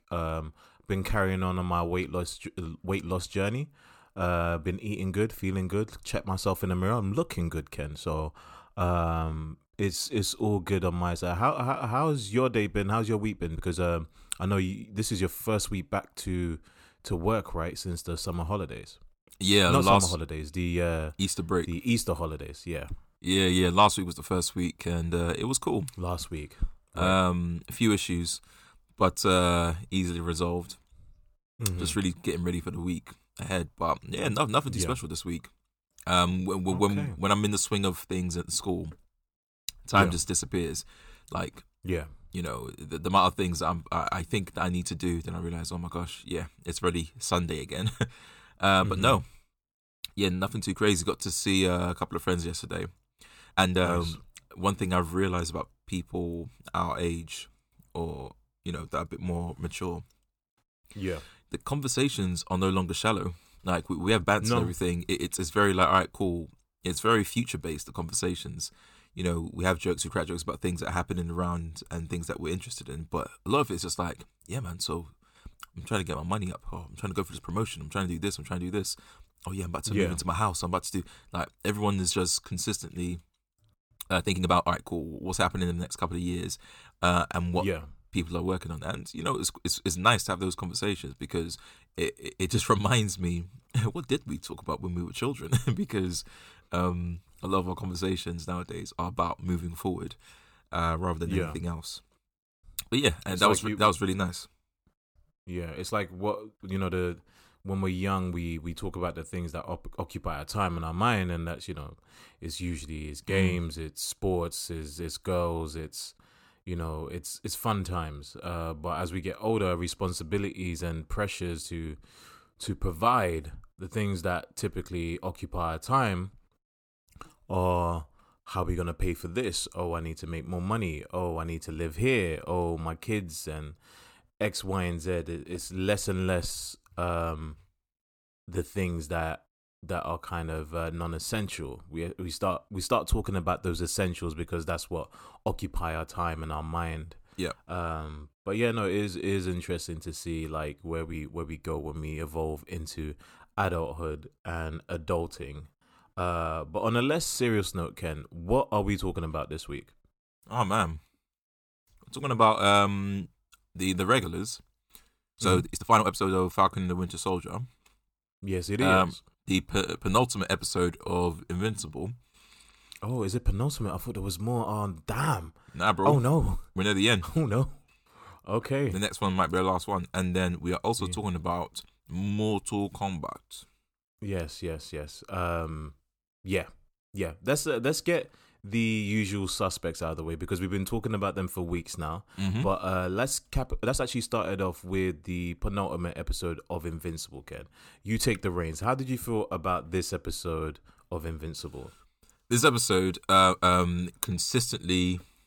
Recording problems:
uneven, jittery; strongly; from 9 s to 3:14

